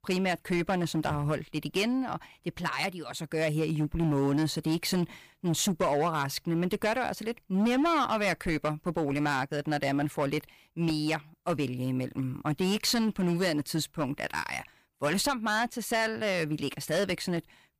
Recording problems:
distortion; slight; 8% of the sound clipped

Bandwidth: 15 kHz